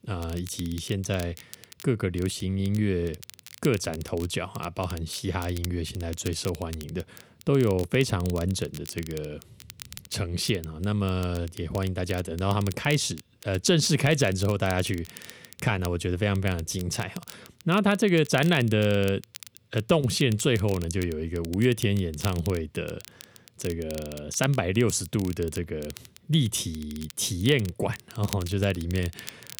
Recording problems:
crackle, like an old record; noticeable; 20 dB below the speech

